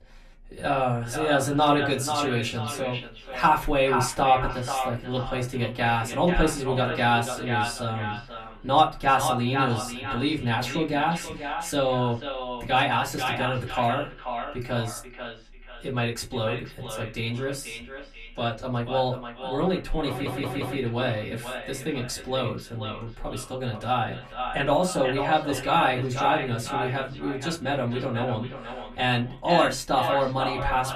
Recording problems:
echo of what is said; strong; throughout; 490 ms later, 7 dB below the speech
off-mic speech; far
room echo; very slight; dies away in 0.2 s
audio stuttering; at 20 s

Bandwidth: 14.5 kHz